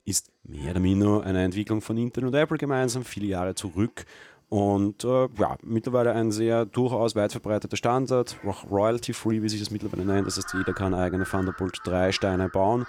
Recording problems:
animal sounds; noticeable; throughout; 15 dB below the speech

